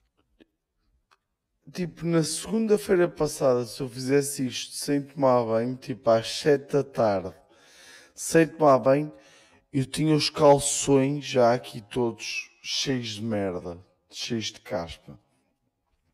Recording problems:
wrong speed, natural pitch; too slow; 0.6 times normal speed

